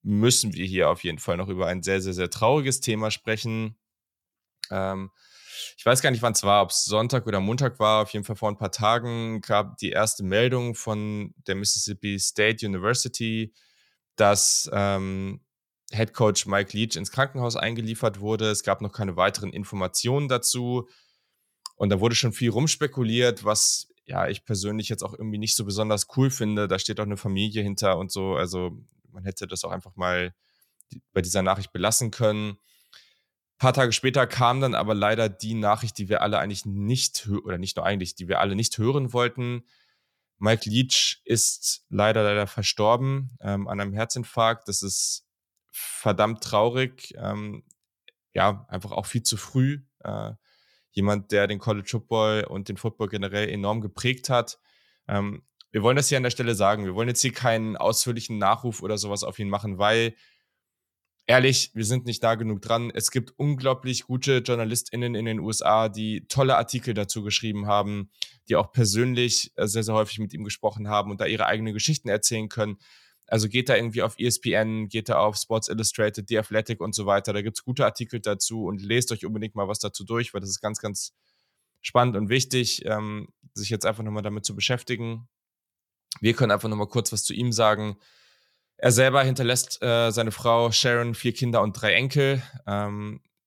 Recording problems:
none

